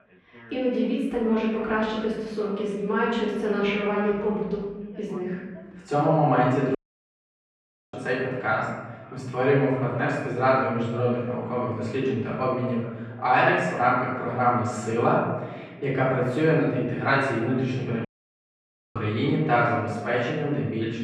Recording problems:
off-mic speech; far
muffled; very; fading above 2.5 kHz
room echo; noticeable; dies away in 1.1 s
background chatter; faint; throughout; 2 voices, 25 dB below the speech
audio cutting out; at 7 s for 1 s and at 18 s for 1 s

